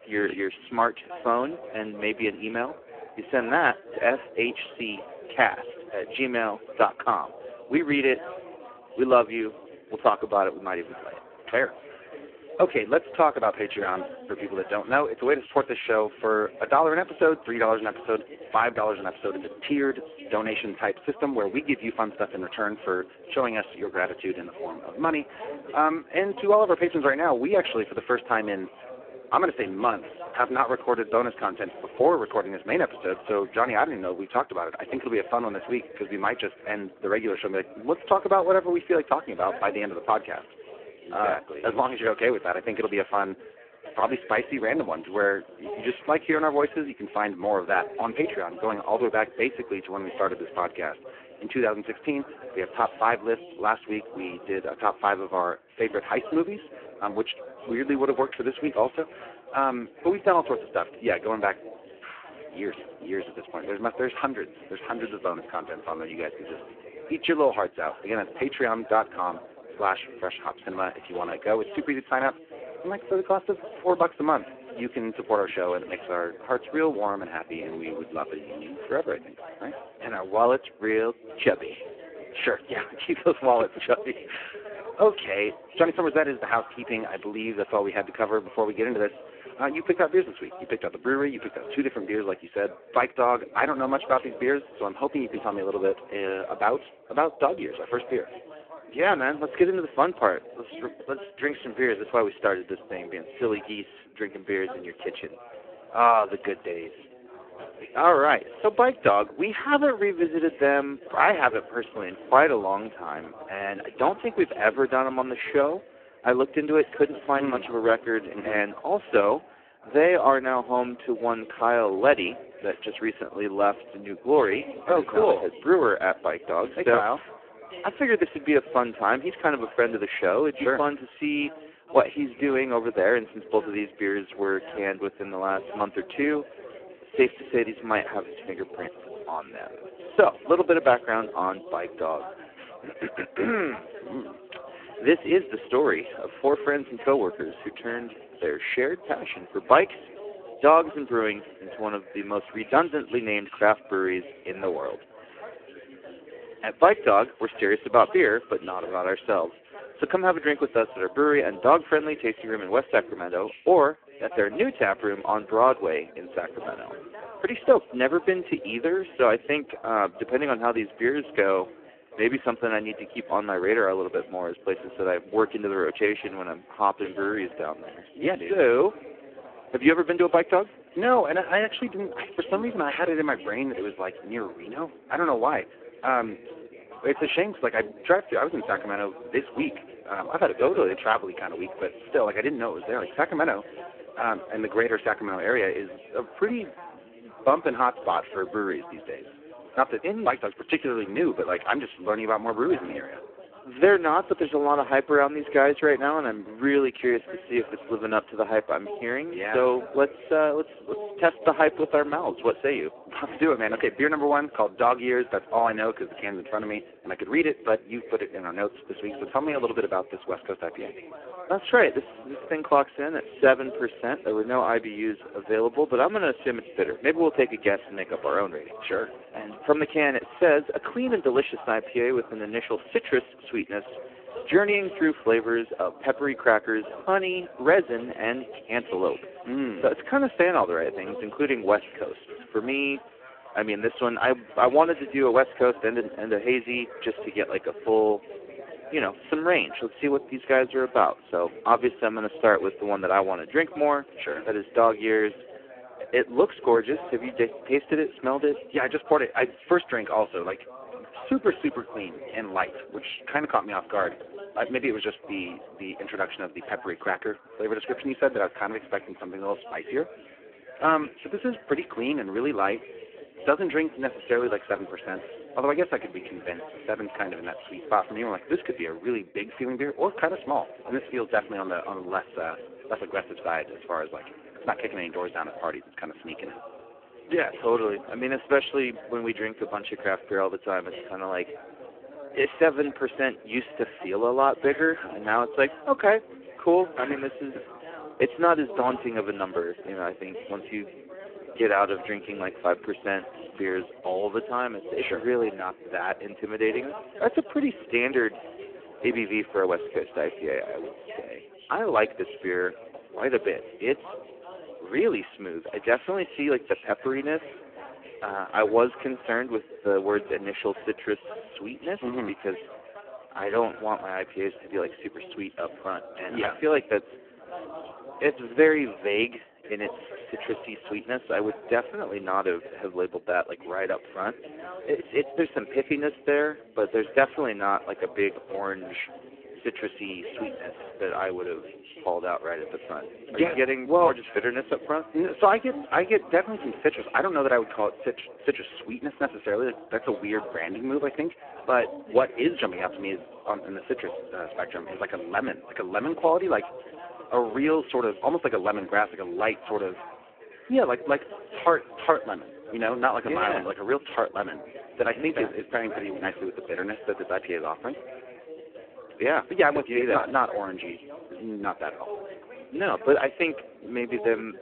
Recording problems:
phone-call audio; poor line
background chatter; noticeable; throughout; 3 voices, 15 dB below the speech

